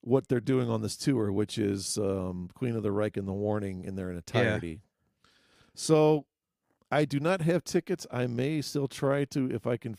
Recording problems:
none

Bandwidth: 15 kHz